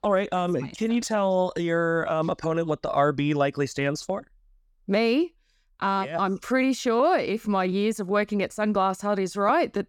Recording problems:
none

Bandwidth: 17.5 kHz